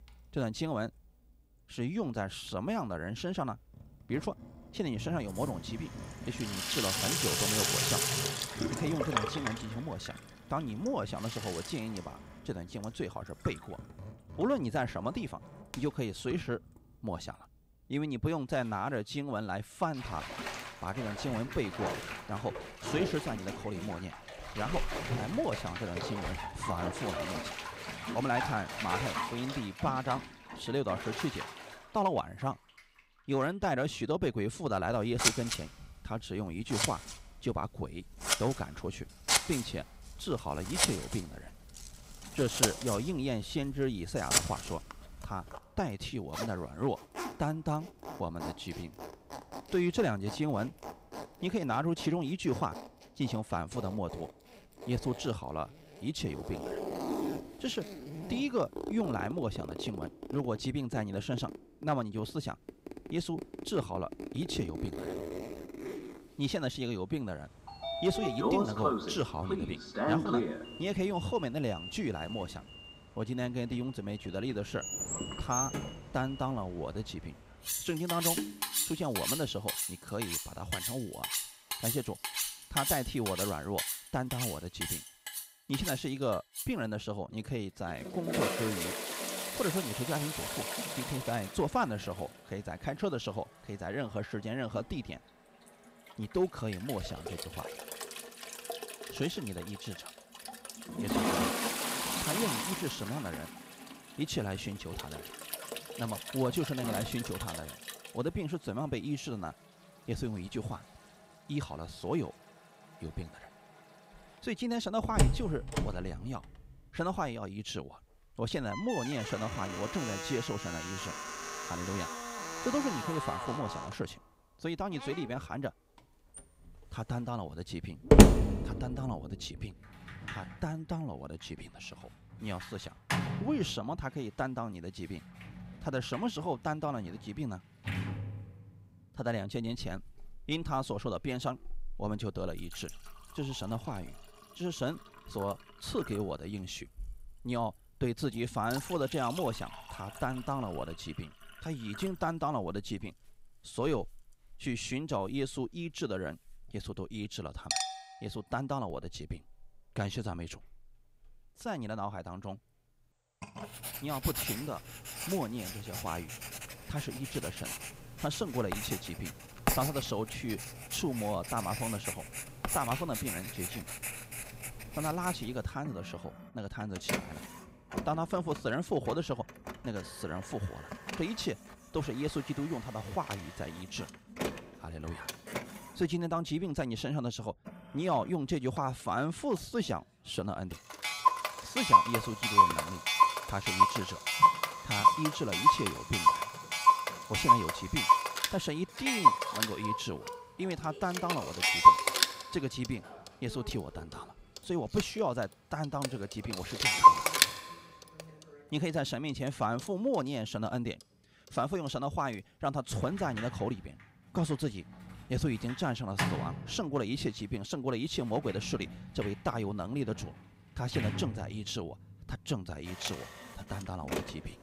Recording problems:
household noises; very loud; throughout; 4 dB above the speech

